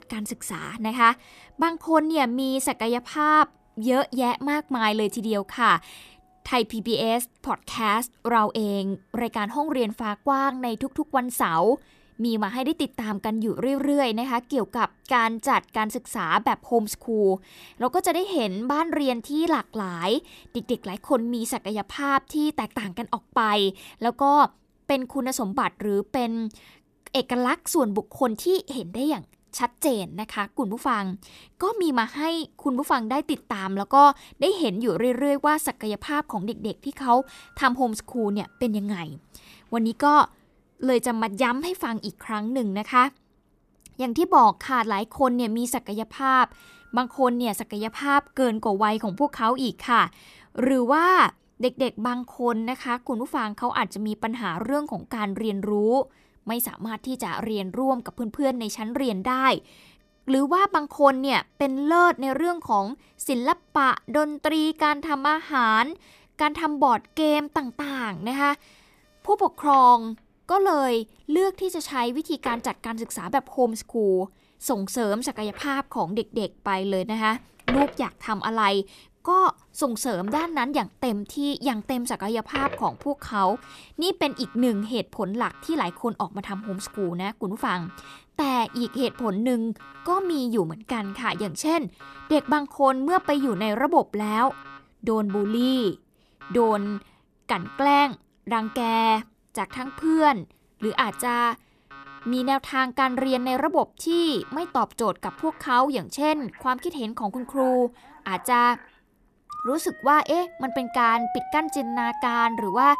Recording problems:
alarms or sirens; noticeable; throughout; 15 dB below the speech

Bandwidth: 14.5 kHz